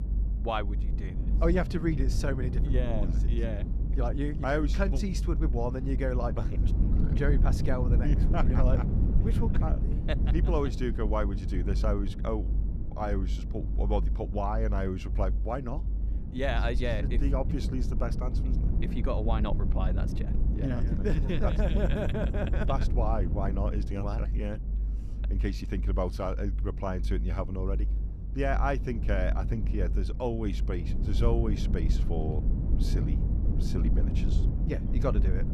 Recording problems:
low rumble; loud; throughout; 9 dB below the speech

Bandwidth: 14.5 kHz